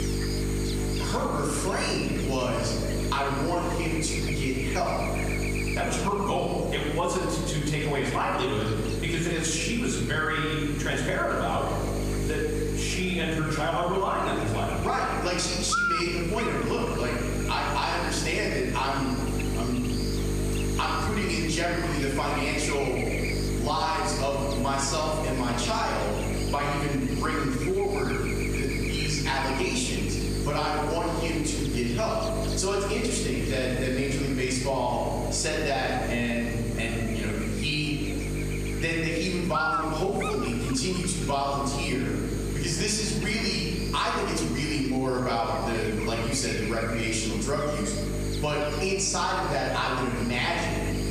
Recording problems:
off-mic speech; far
room echo; noticeable; dies away in 1.2 s
squashed, flat; somewhat
electrical hum; loud; throughout; 50 Hz, 7 dB below the speech
background chatter; faint; throughout; 3 voices, 25 dB below the speech

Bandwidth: 14.5 kHz